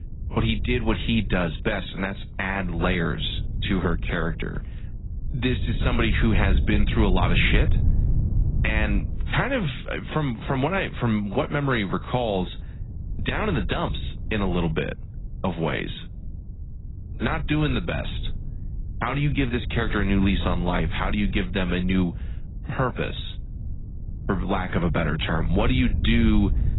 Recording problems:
garbled, watery; badly; nothing above 4 kHz
wind noise on the microphone; occasional gusts; 20 dB below the speech

